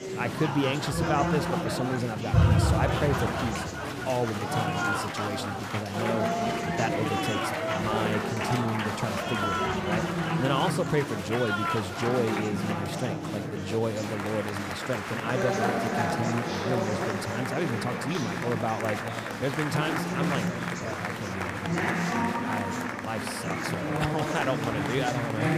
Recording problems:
murmuring crowd; very loud; throughout; 2 dB above the speech

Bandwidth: 15 kHz